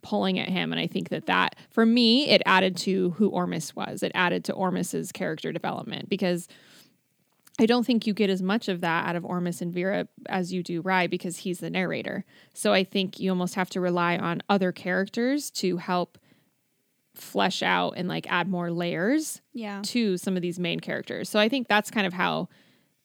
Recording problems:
none

